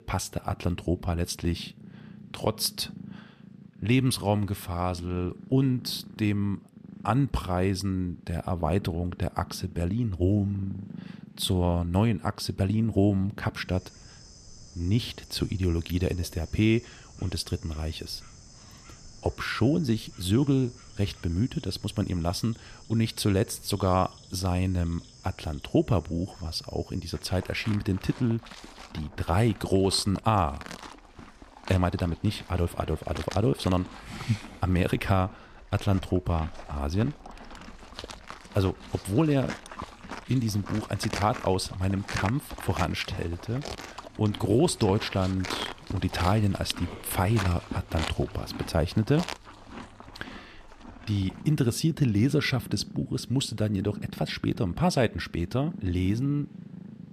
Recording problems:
animal sounds; noticeable; throughout; 15 dB below the speech

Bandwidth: 14.5 kHz